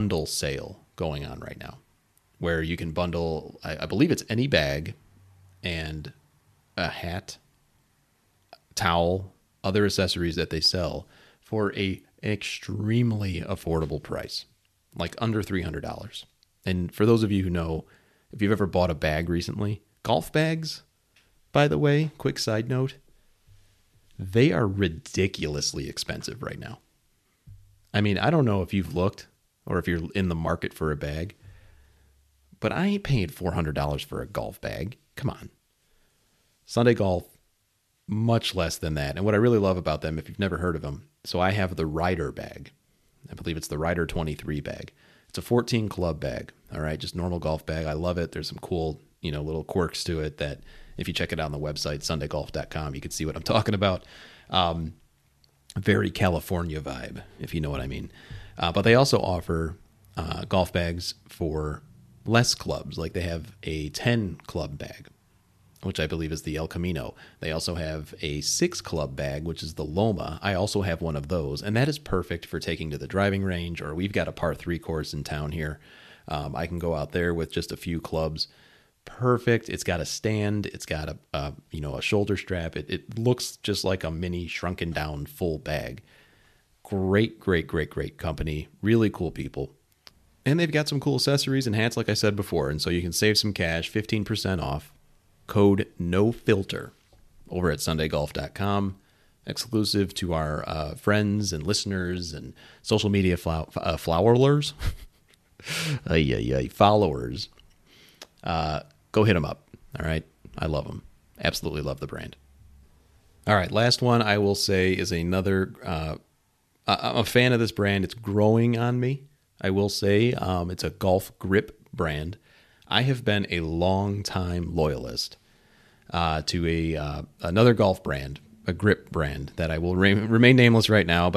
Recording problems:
abrupt cut into speech; at the start and the end

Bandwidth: 13.5 kHz